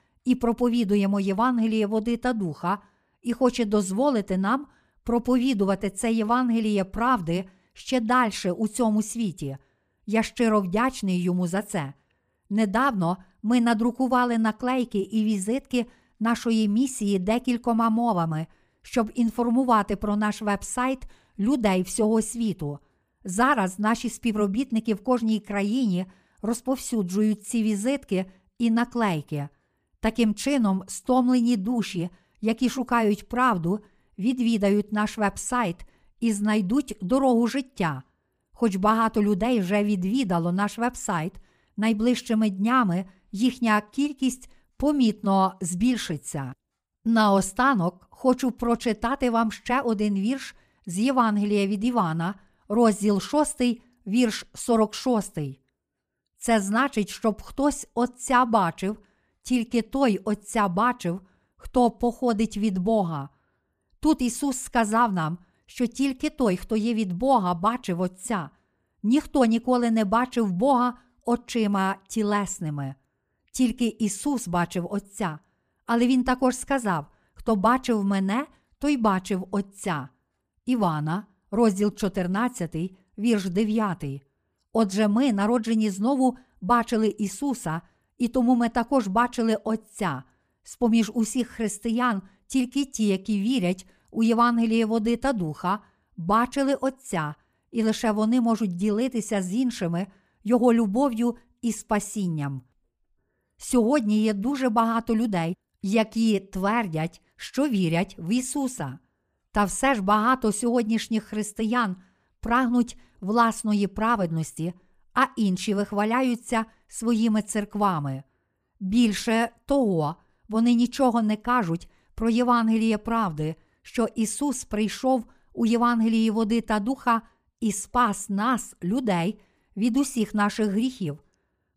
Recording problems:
none

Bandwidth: 15 kHz